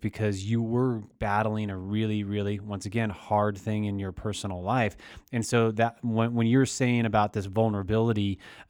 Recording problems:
none

